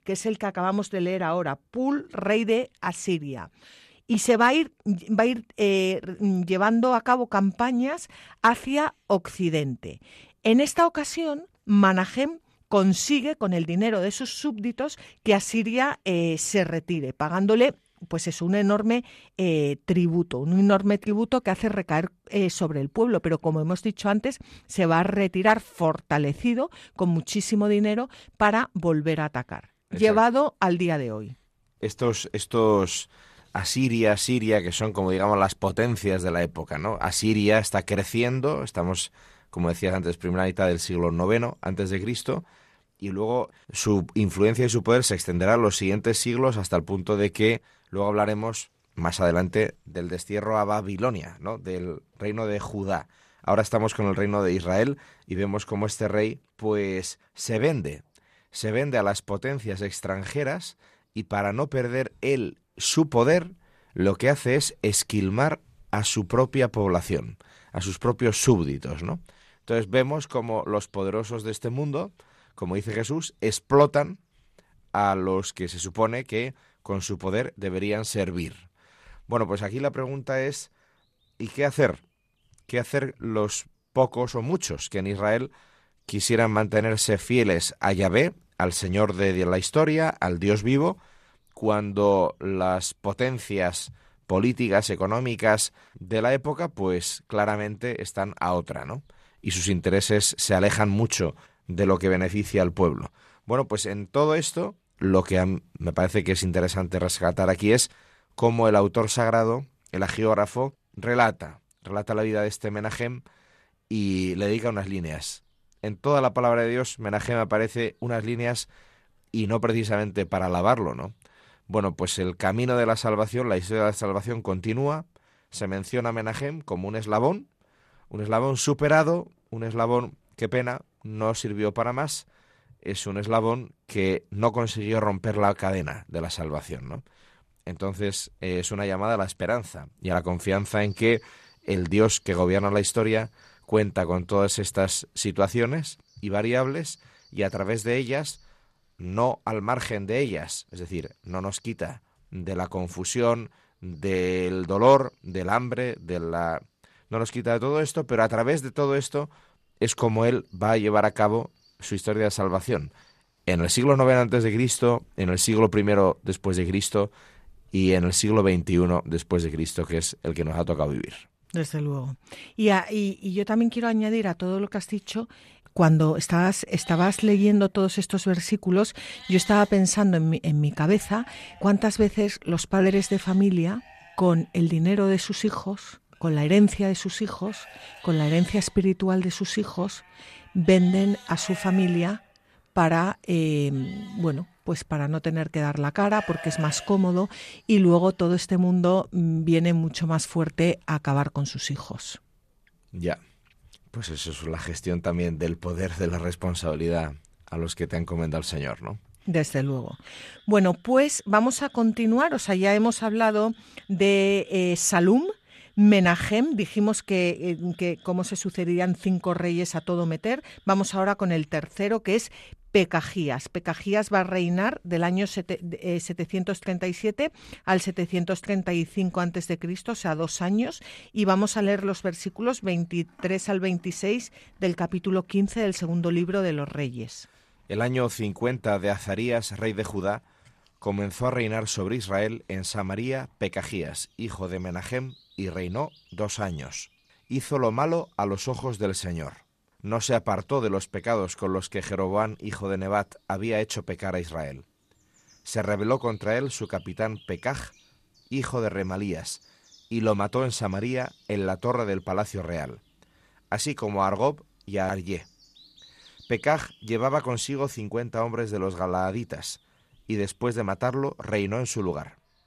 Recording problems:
animal sounds; faint; throughout; 25 dB below the speech

